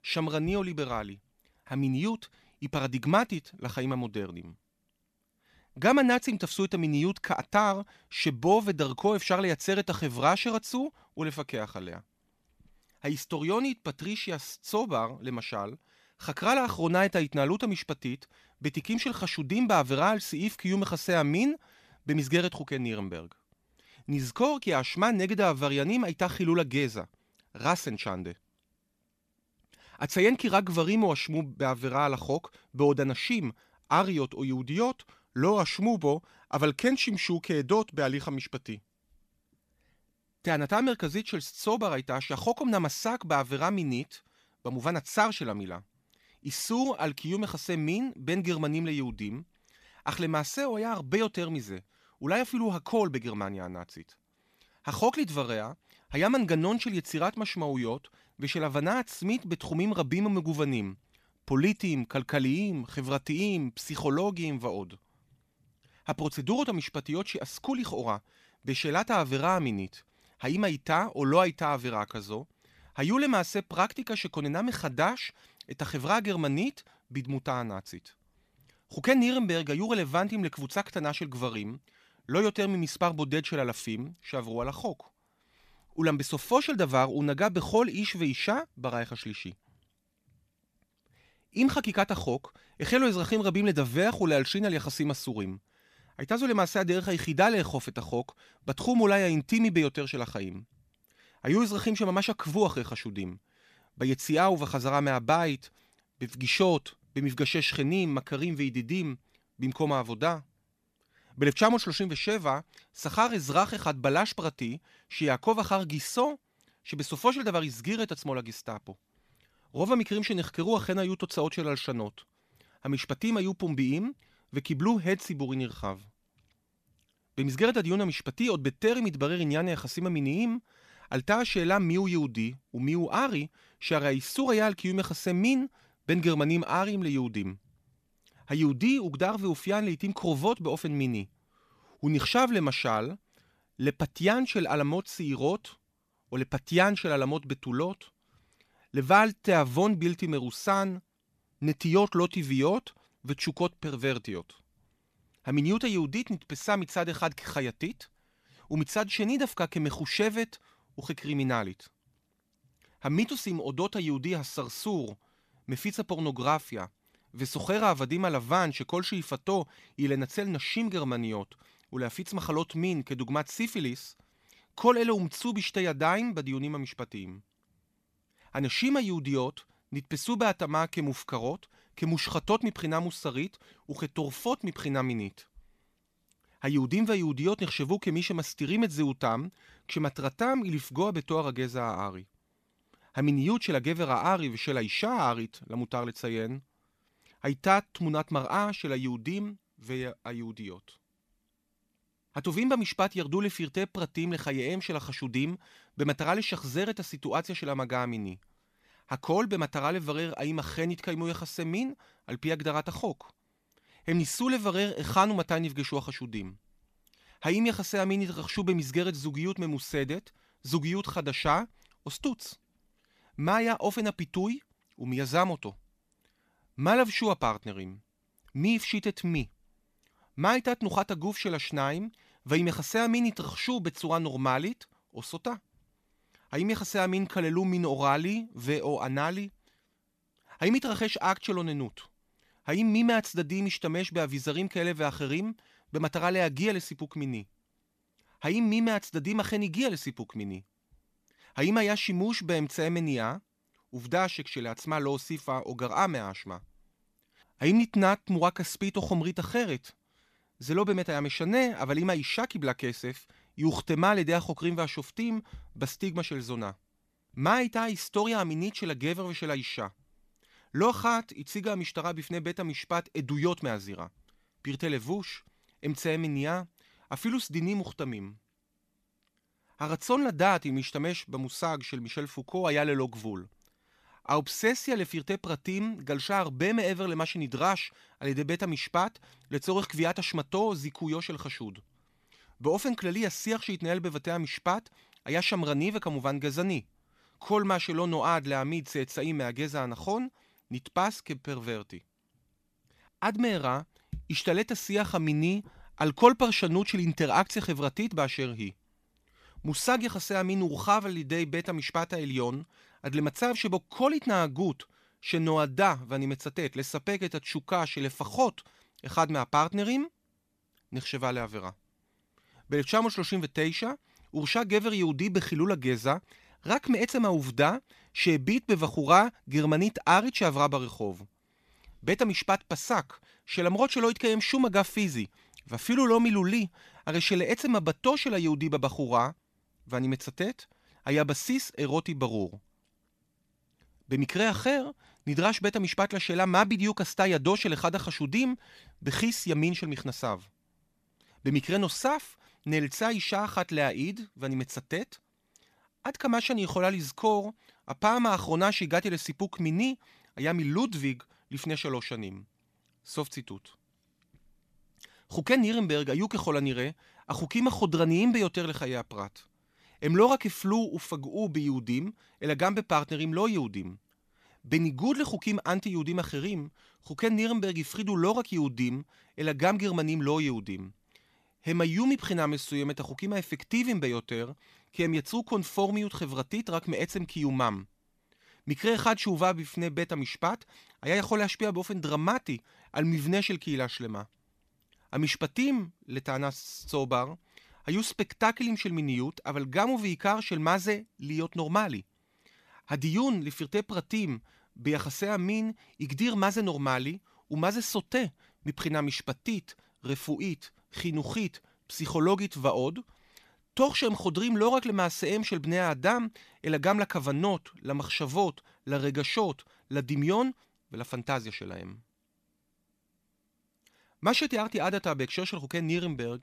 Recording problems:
none

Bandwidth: 14.5 kHz